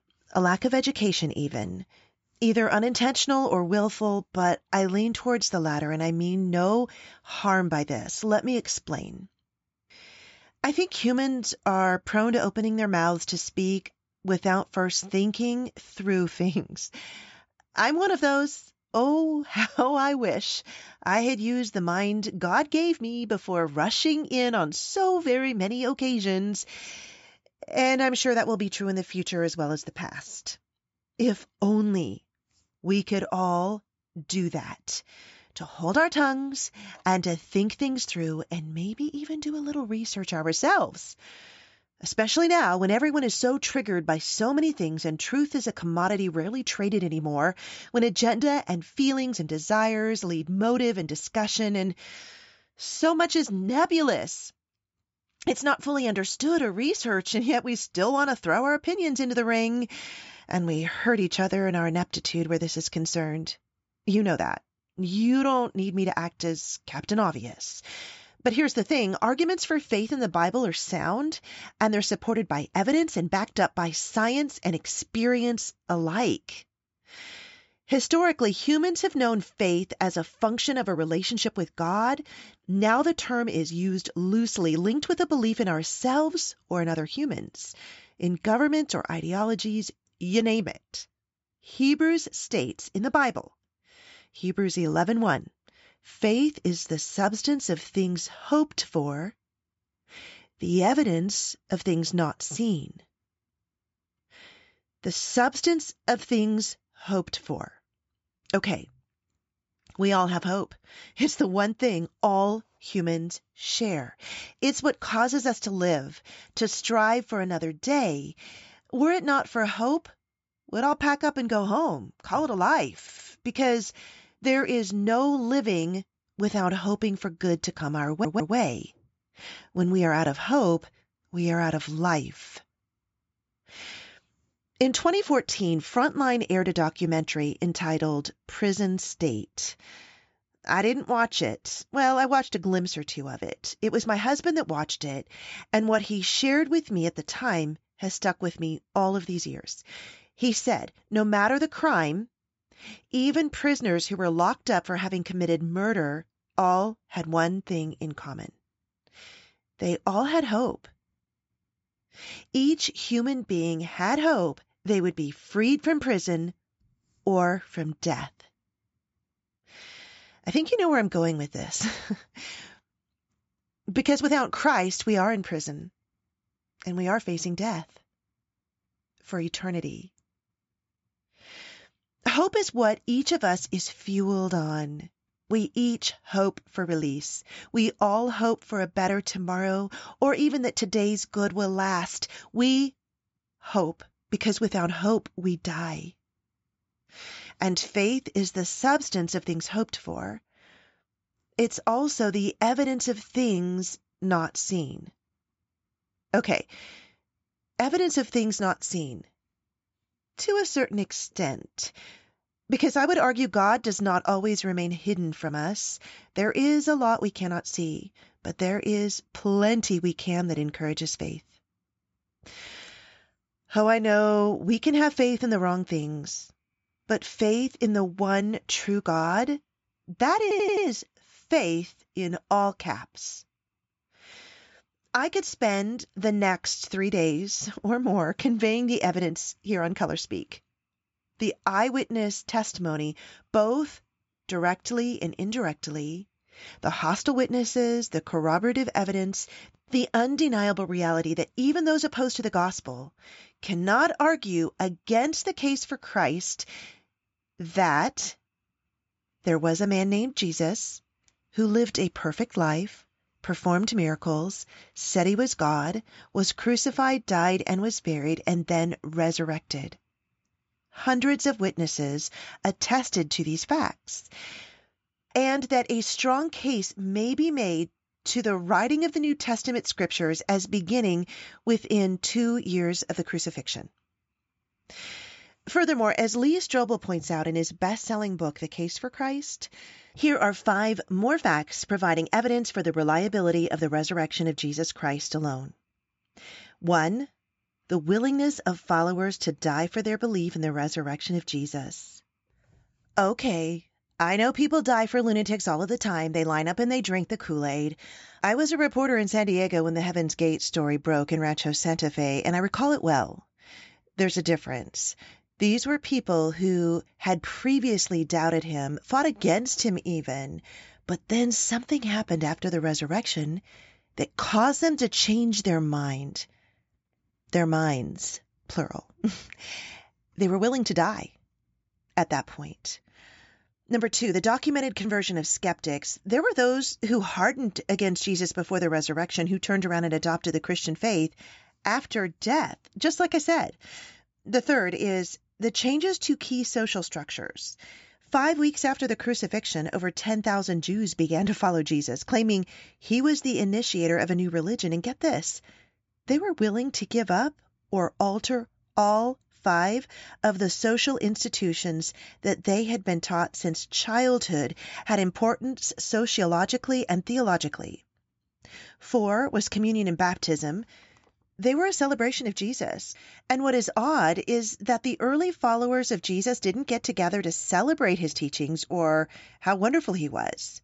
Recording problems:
high frequencies cut off; noticeable; nothing above 8 kHz
audio stuttering; at 2:03, at 2:08 and at 3:50

